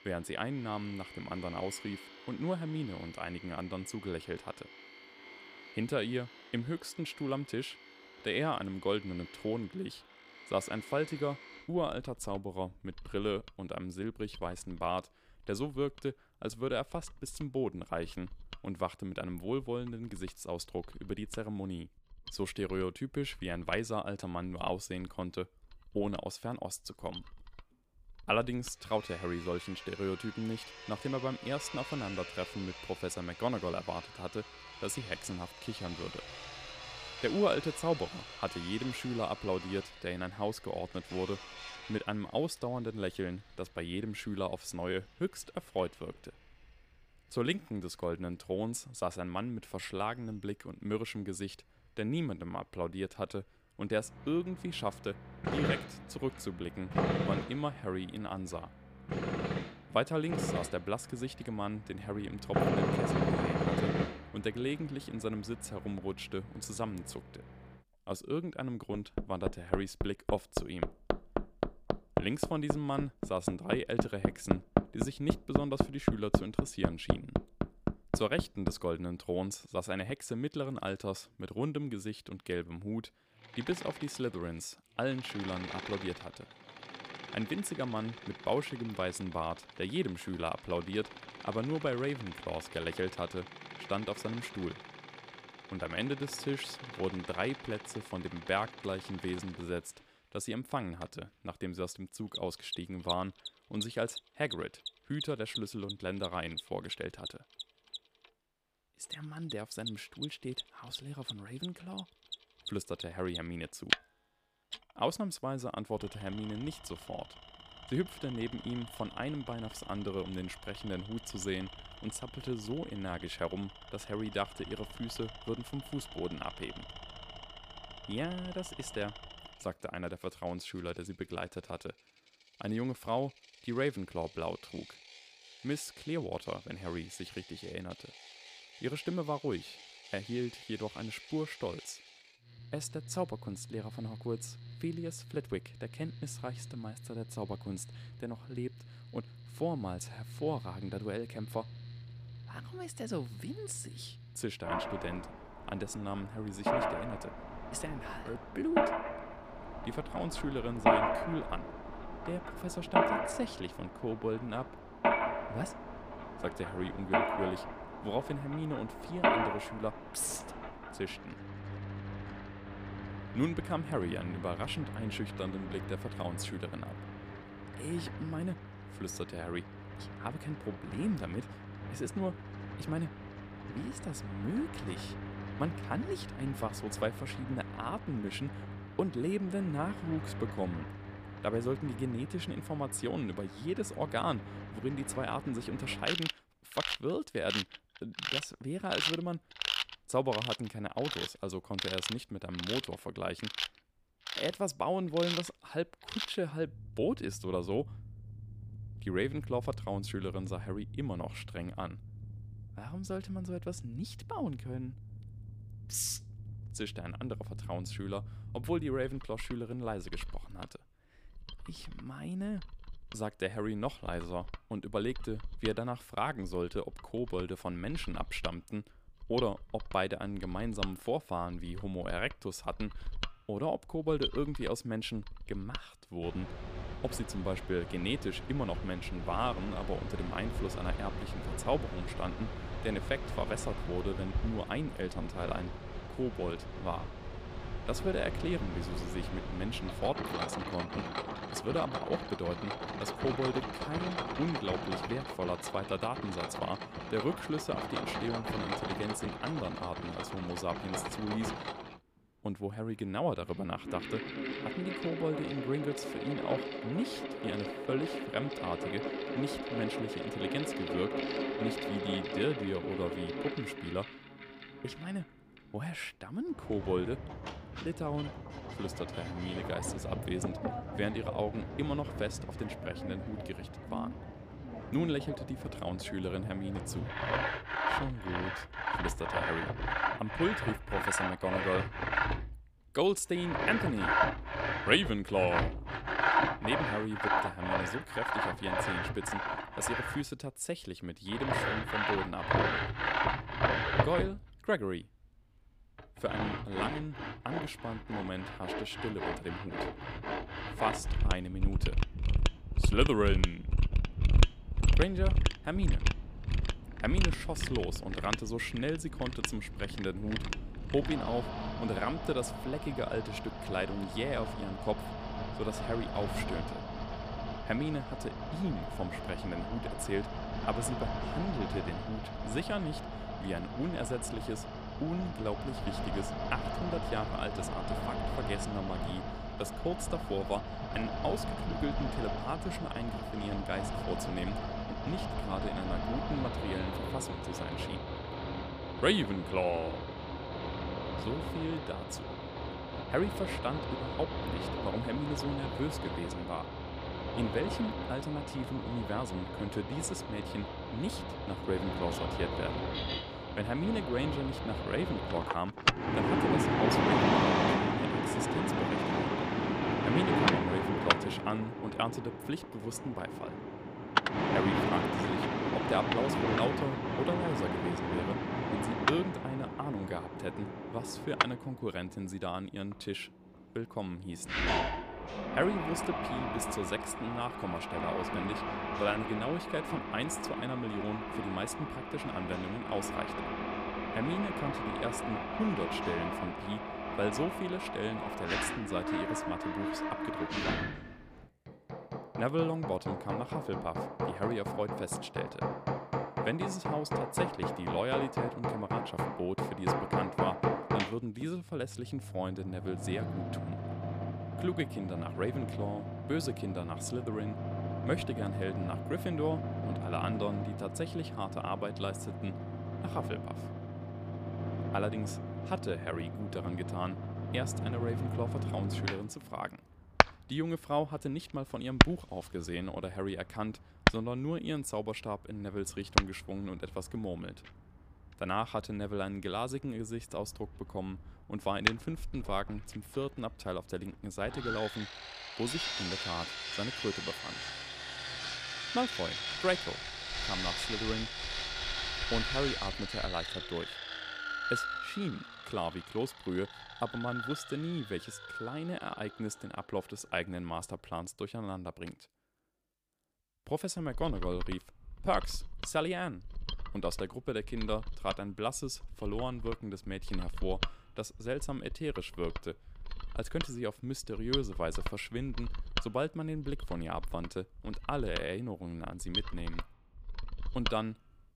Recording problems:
machinery noise; very loud; throughout; as loud as the speech

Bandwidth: 15 kHz